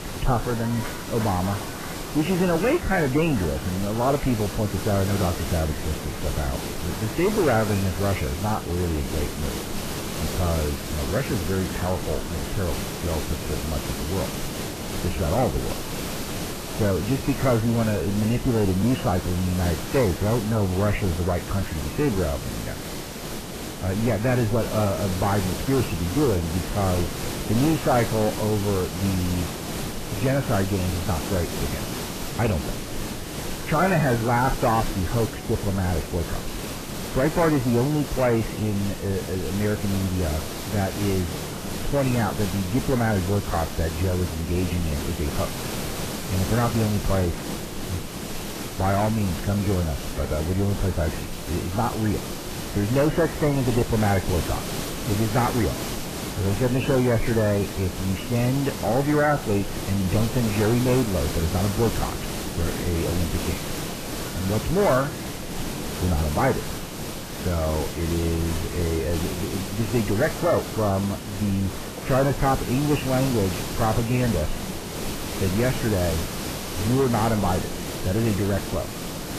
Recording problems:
garbled, watery; badly; nothing above 3 kHz
distortion; slight; 10 dB below the speech
hiss; loud; throughout; 6 dB below the speech
chatter from many people; noticeable; throughout; 20 dB below the speech
audio cutting out; at 48 s for 1 s

